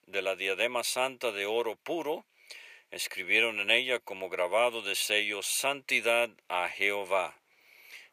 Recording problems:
thin; very; fading below 500 Hz

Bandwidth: 15 kHz